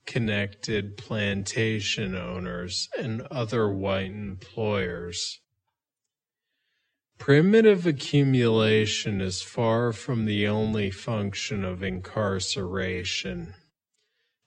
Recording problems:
wrong speed, natural pitch; too slow; 0.6 times normal speed

